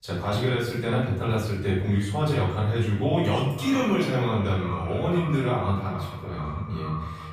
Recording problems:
echo of what is said; strong; from 3.5 s on; 450 ms later, 10 dB below the speech
off-mic speech; far
room echo; noticeable; dies away in 0.8 s

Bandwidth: 15 kHz